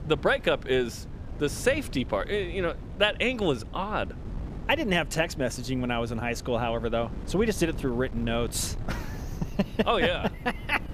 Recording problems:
wind noise on the microphone; occasional gusts; 20 dB below the speech

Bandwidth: 14.5 kHz